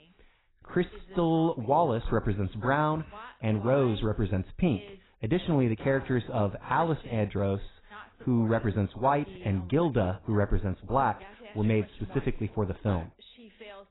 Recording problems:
garbled, watery; badly; nothing above 4 kHz
voice in the background; faint; throughout; 20 dB below the speech

